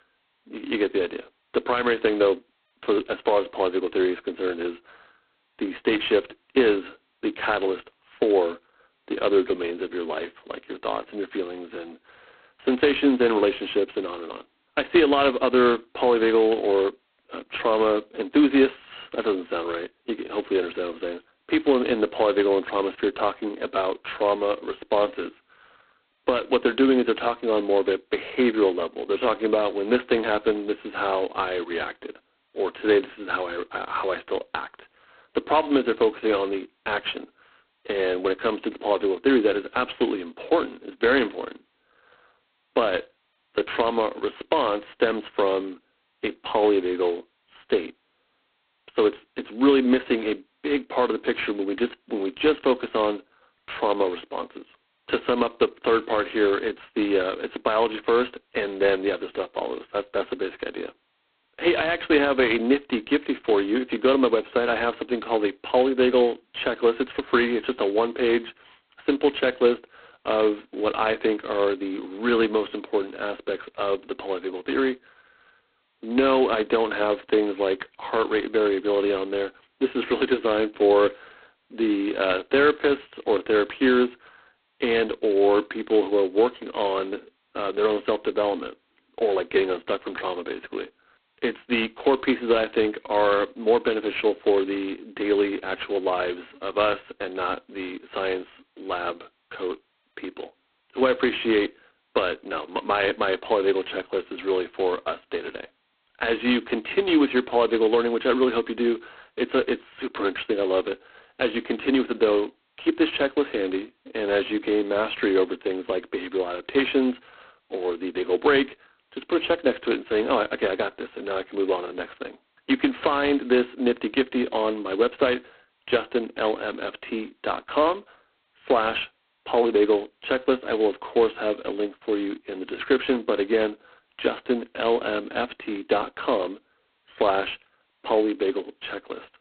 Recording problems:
phone-call audio; poor line; nothing above 4 kHz

